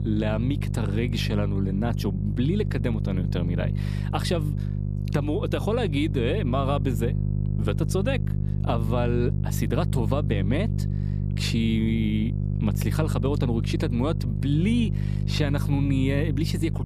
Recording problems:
electrical hum; loud; throughout; 50 Hz, 8 dB below the speech

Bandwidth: 14.5 kHz